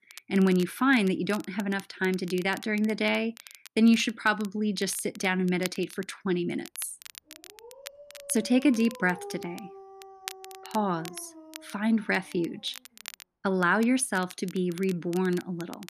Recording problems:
crackle, like an old record; noticeable; 20 dB below the speech
dog barking; faint; from 7.5 to 13 s; peak 15 dB below the speech

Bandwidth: 14.5 kHz